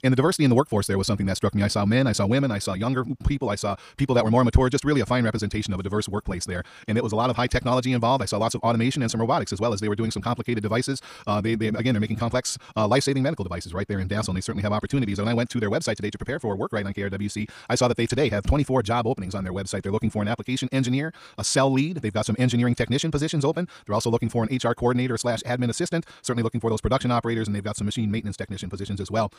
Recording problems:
wrong speed, natural pitch; too fast; 1.8 times normal speed

